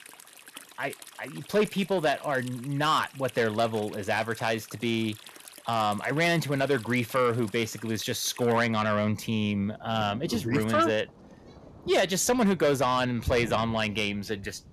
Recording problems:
distortion; slight; 10 dB below the speech
rain or running water; noticeable; throughout; 20 dB below the speech

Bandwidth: 14.5 kHz